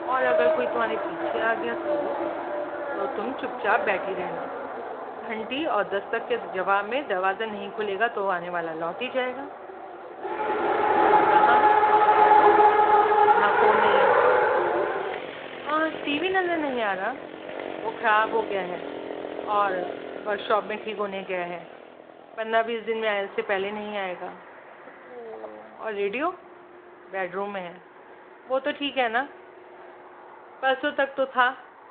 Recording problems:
phone-call audio
traffic noise; very loud; throughout; 4 dB above the speech

